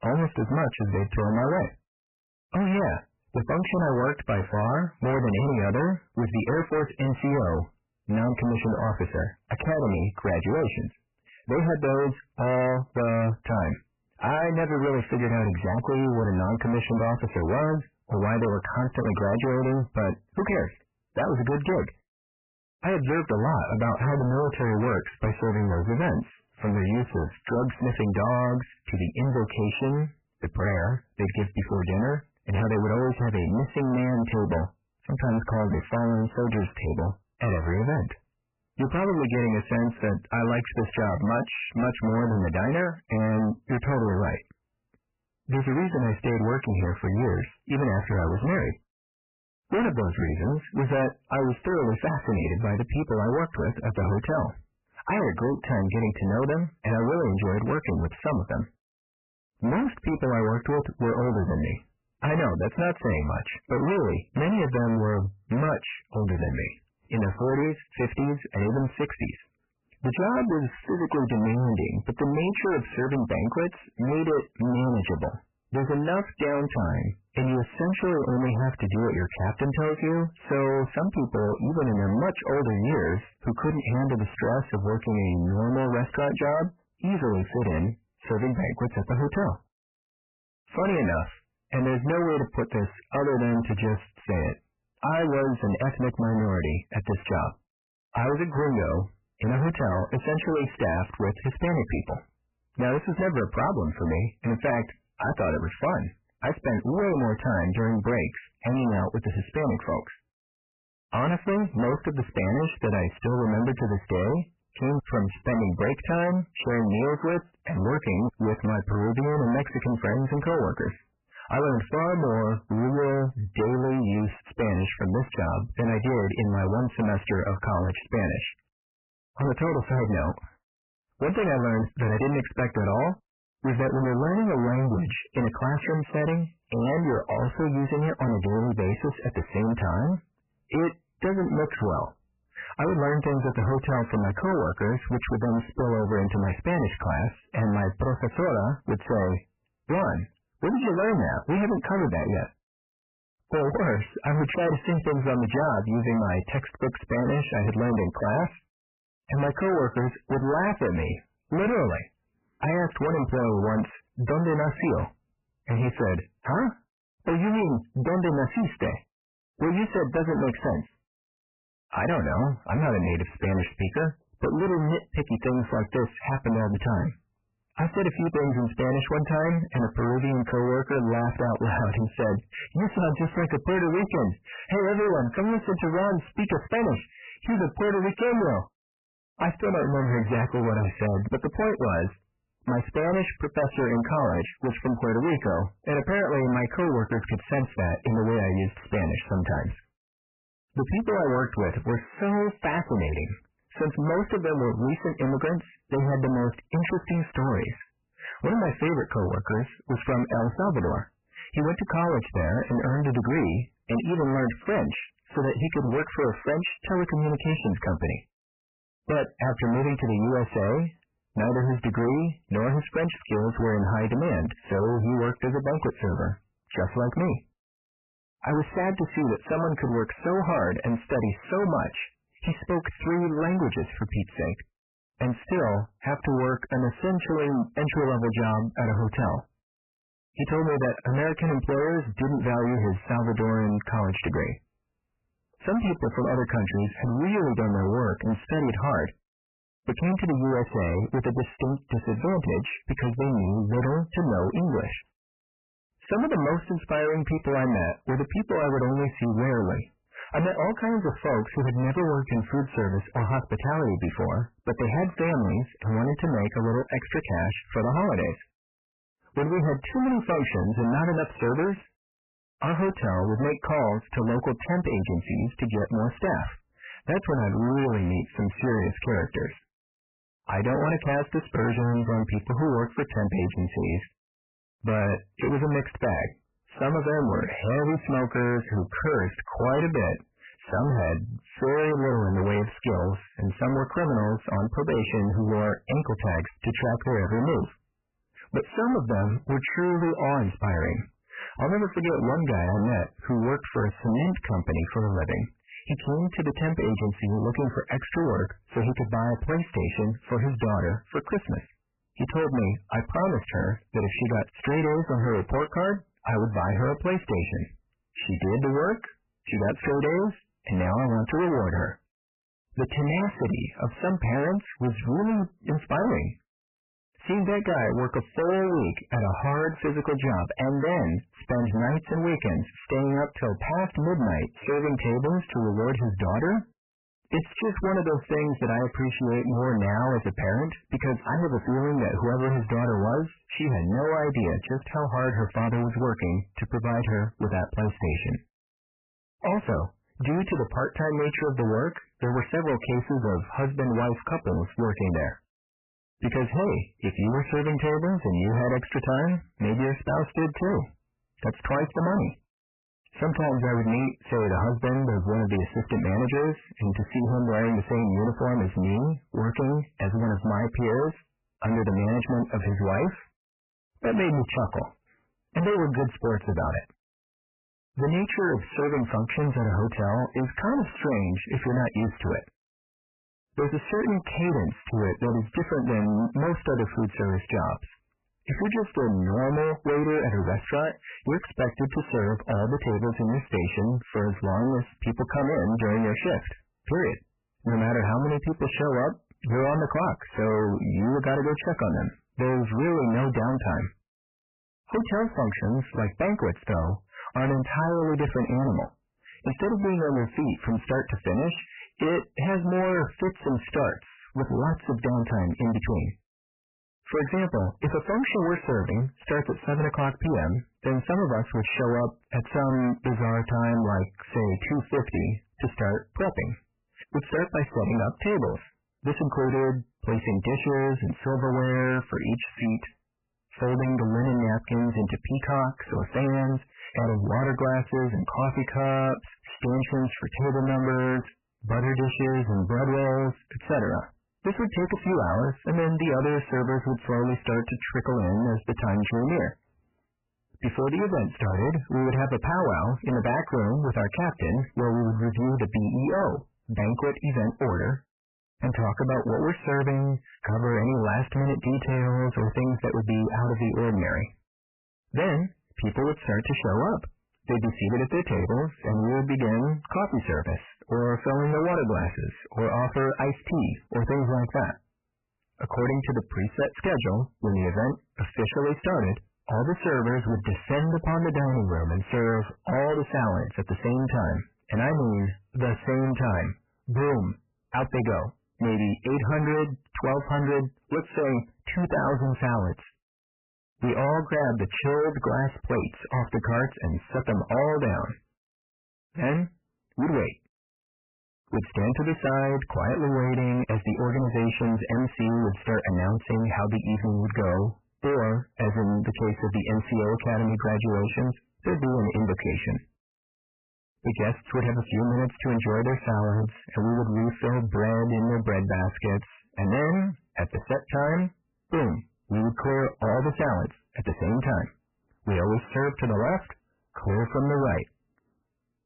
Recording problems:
distortion; heavy; 6 dB below the speech
garbled, watery; badly; nothing above 3 kHz

